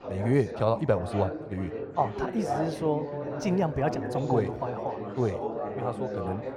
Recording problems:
muffled; very; fading above 4 kHz
echo of what is said; faint; throughout; 500 ms later, 25 dB below the speech
background chatter; loud; throughout; 4 voices, 5 dB below the speech

